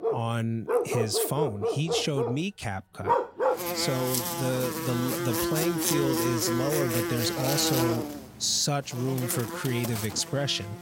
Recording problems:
animal sounds; very loud; throughout; as loud as the speech

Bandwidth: 16 kHz